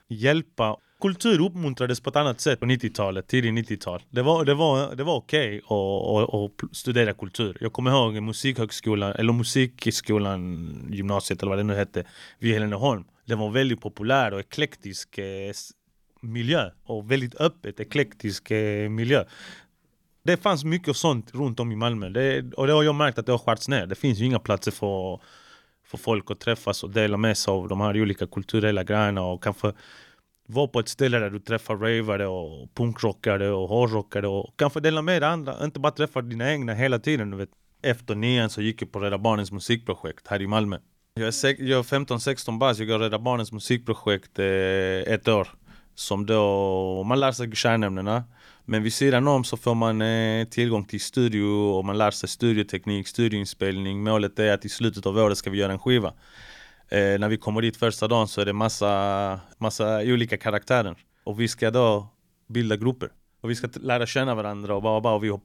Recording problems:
none

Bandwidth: 18.5 kHz